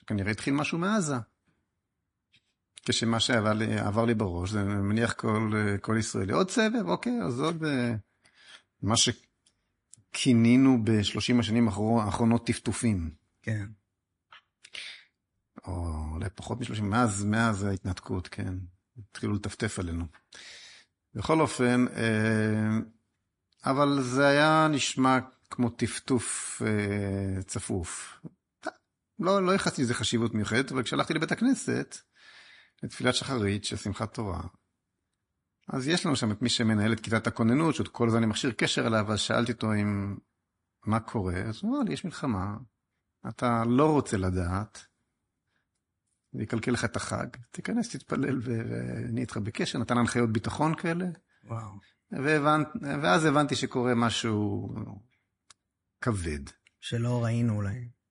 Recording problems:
garbled, watery; slightly; nothing above 10.5 kHz

